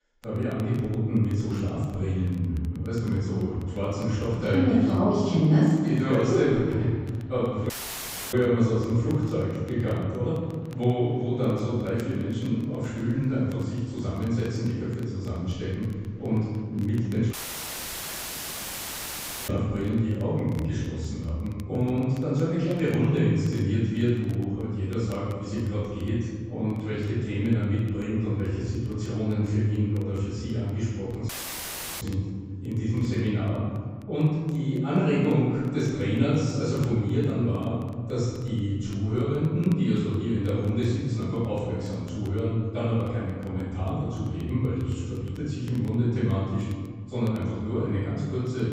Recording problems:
room echo; strong; dies away in 1.7 s
off-mic speech; far
high frequencies cut off; noticeable; nothing above 8 kHz
rain or running water; very faint; throughout; 30 dB below the speech
crackle, like an old record; very faint; 30 dB below the speech
audio cutting out; at 7.5 s for 0.5 s, at 17 s for 2 s and at 31 s for 0.5 s

